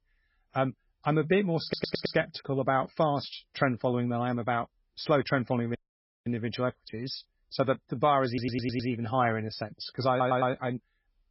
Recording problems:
garbled, watery; badly; nothing above 5.5 kHz
audio stuttering; at 1.5 s, at 8.5 s and at 10 s
audio cutting out; at 6 s for 0.5 s

